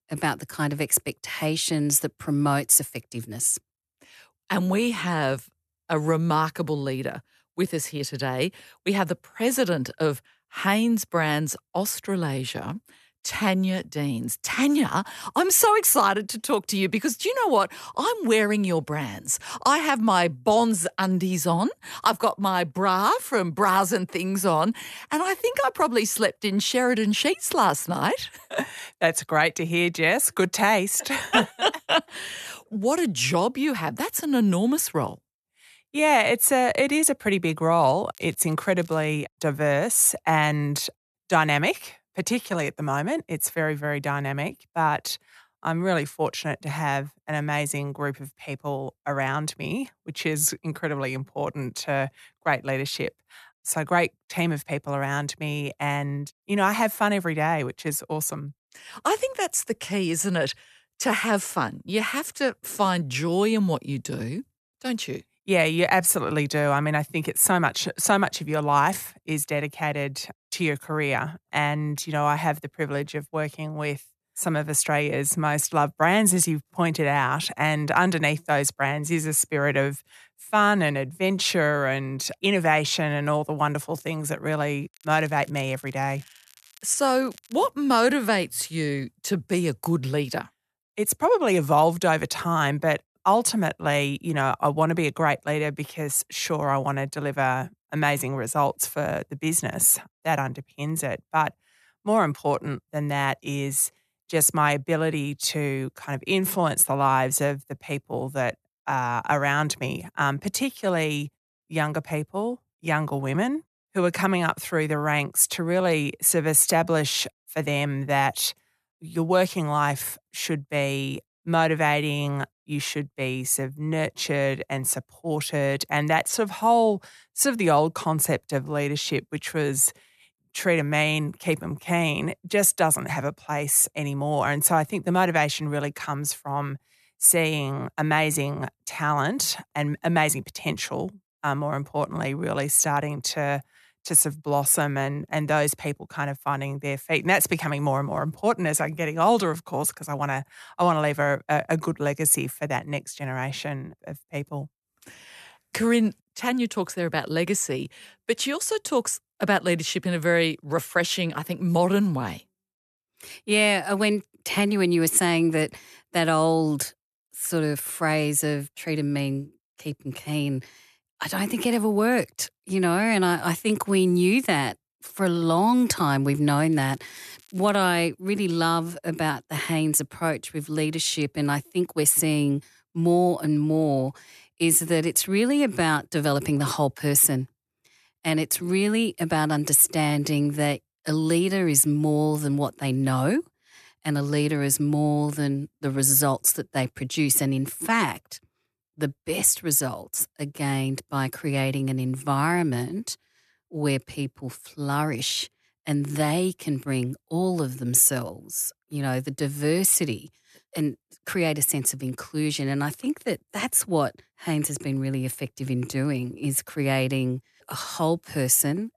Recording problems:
crackling; faint; at 38 s, from 1:25 to 1:28 and from 2:57 to 2:58; 25 dB below the speech

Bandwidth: 13.5 kHz